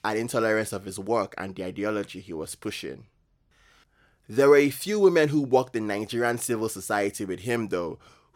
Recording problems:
none

